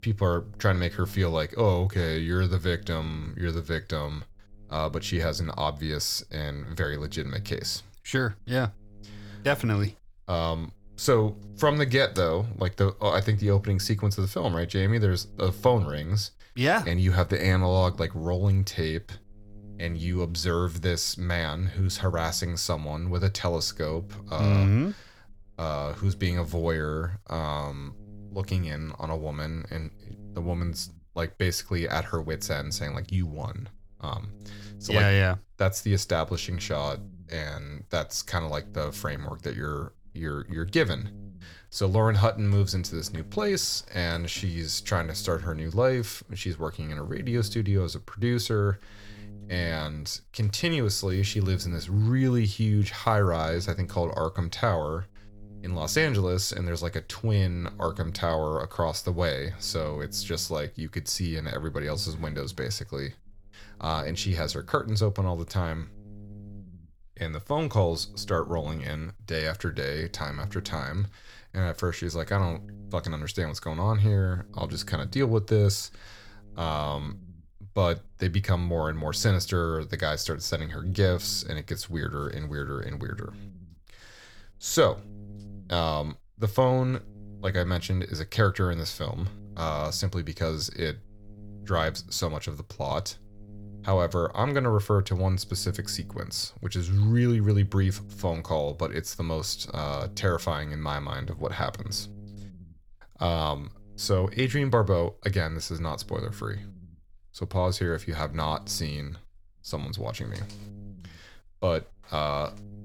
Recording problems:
electrical hum; faint; throughout; 60 Hz, 25 dB below the speech

